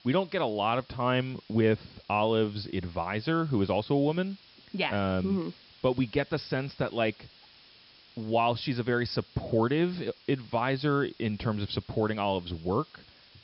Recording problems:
high frequencies cut off; noticeable; nothing above 5.5 kHz
hiss; faint; throughout; 25 dB below the speech

